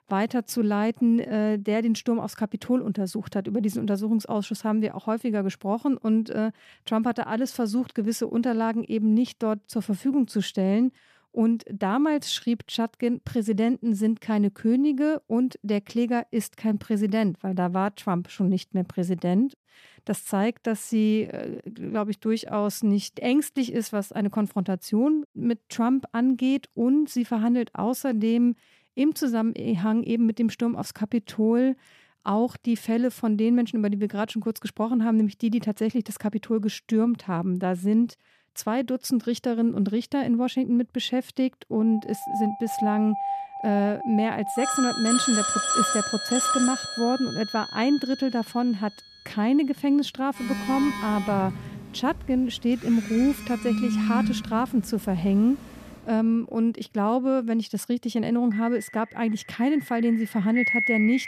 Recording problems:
alarms or sirens; loud; from 42 s on; 4 dB below the speech

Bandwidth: 14.5 kHz